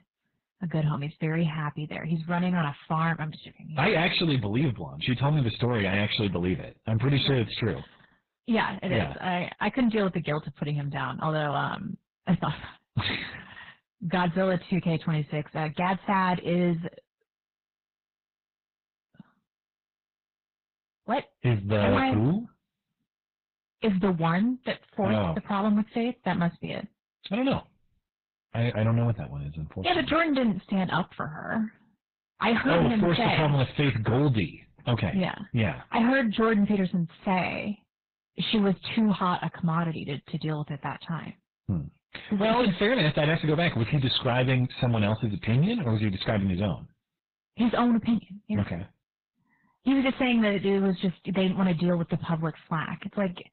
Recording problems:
garbled, watery; badly; nothing above 4 kHz
distortion; slight; 7% of the sound clipped

